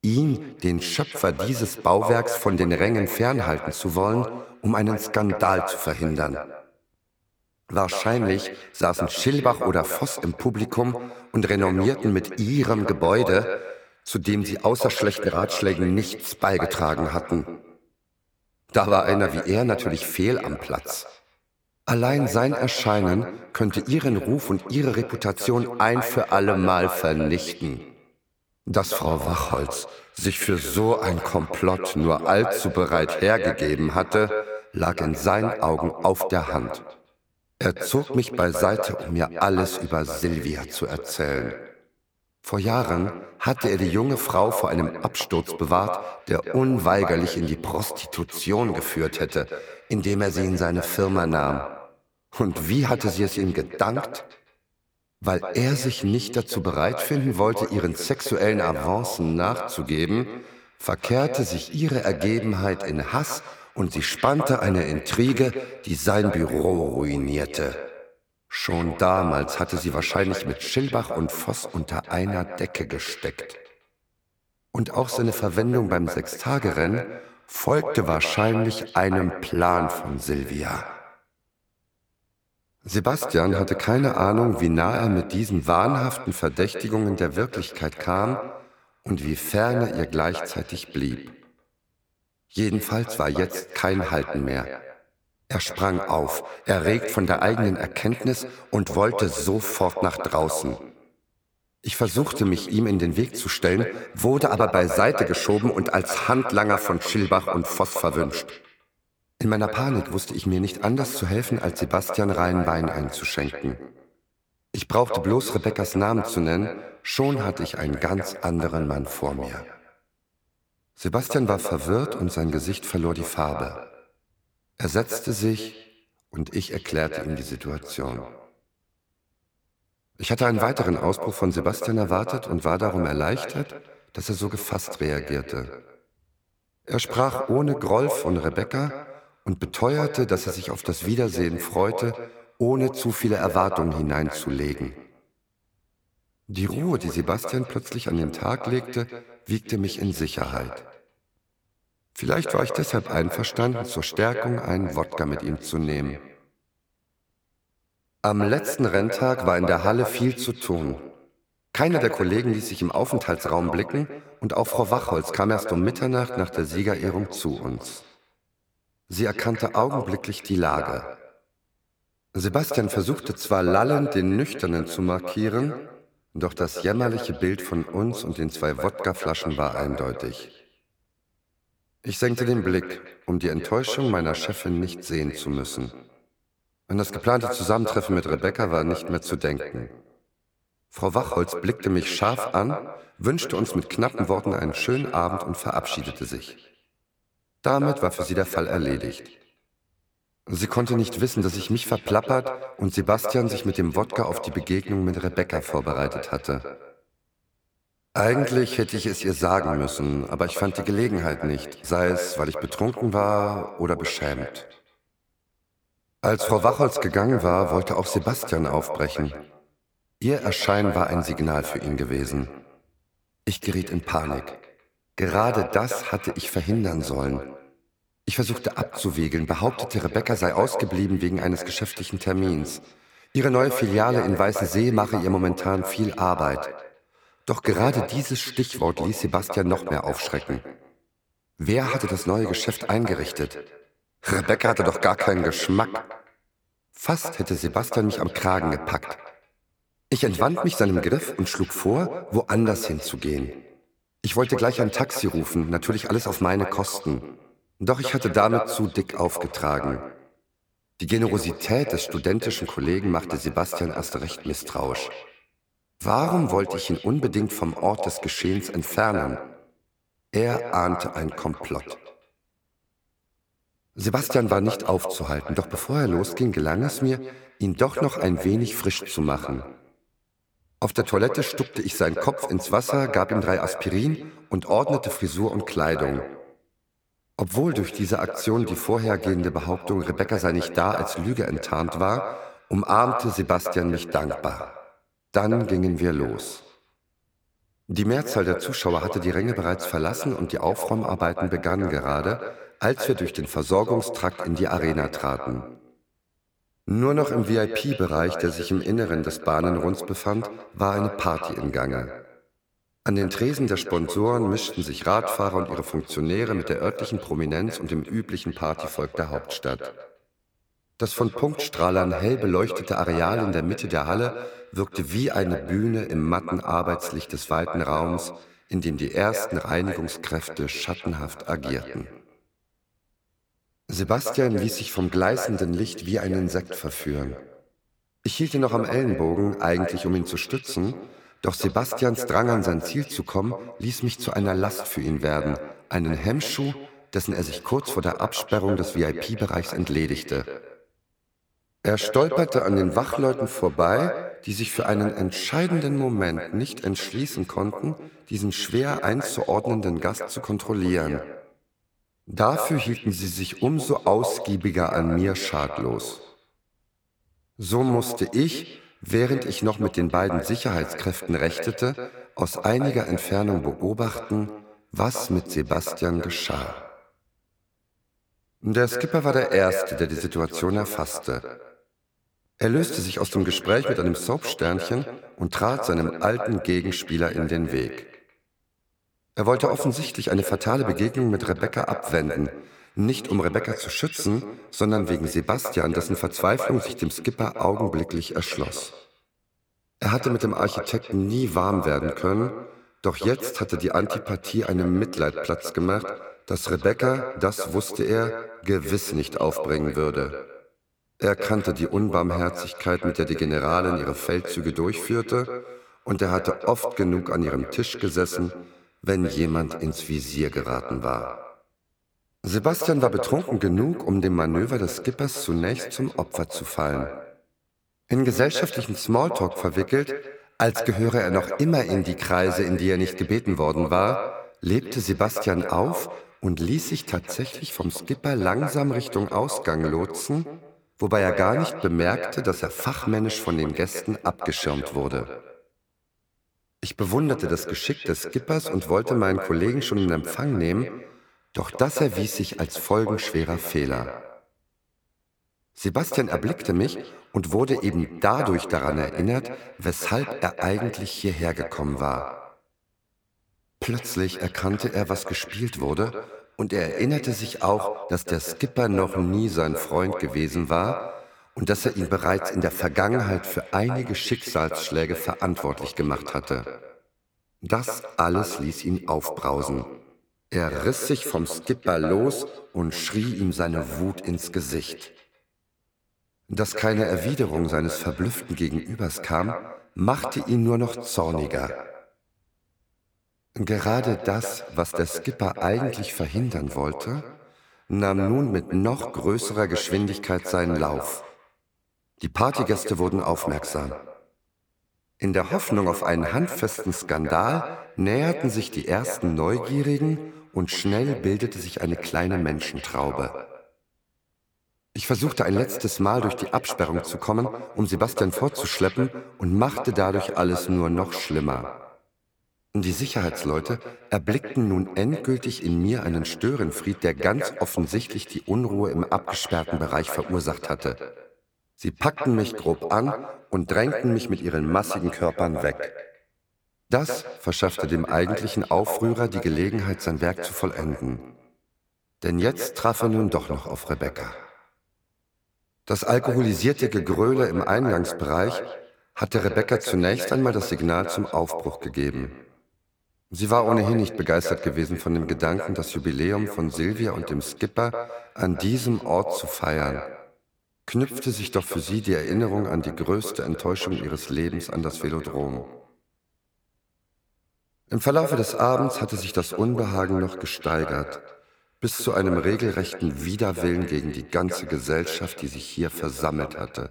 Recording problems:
echo of what is said; strong; throughout; 160 ms later, 9 dB below the speech

